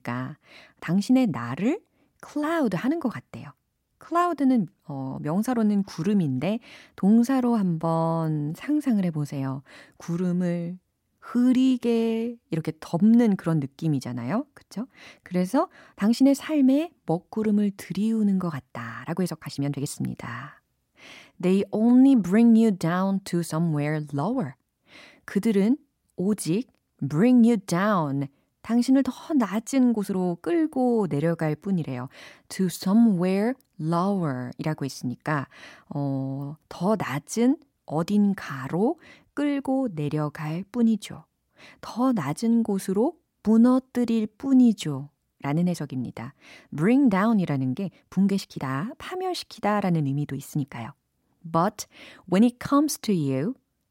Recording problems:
uneven, jittery; strongly; from 1 to 53 s

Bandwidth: 16 kHz